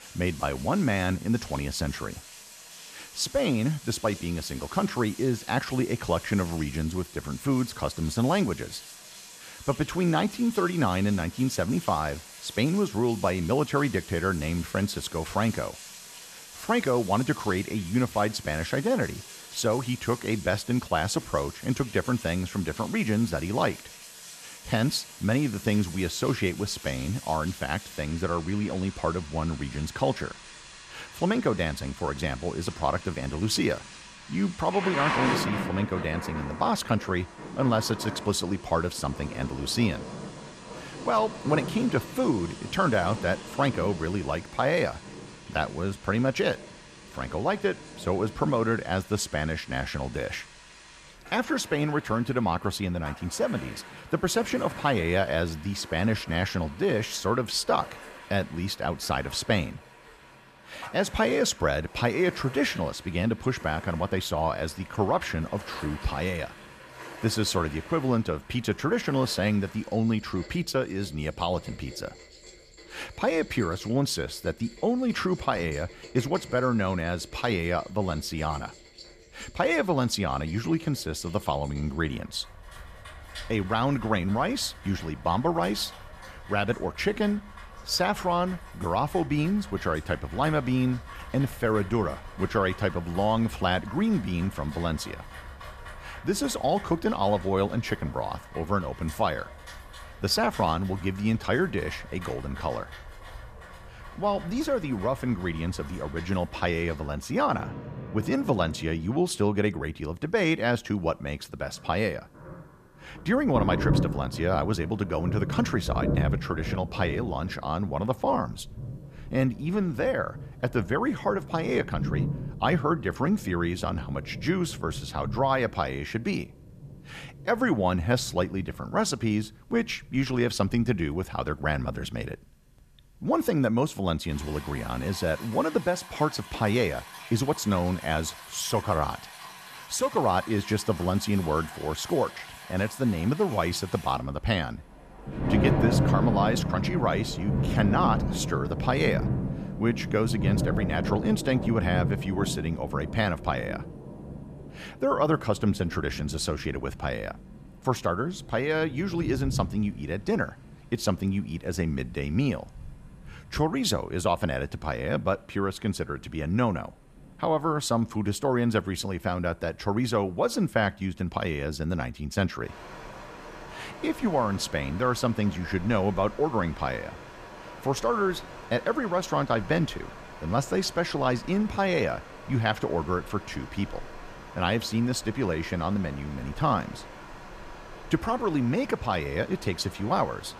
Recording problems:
rain or running water; noticeable; throughout; 10 dB below the speech

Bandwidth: 14.5 kHz